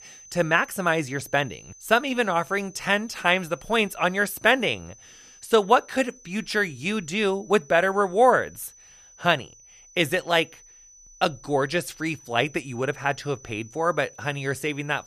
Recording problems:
high-pitched whine; faint; throughout; 6 kHz, 25 dB below the speech

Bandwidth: 14.5 kHz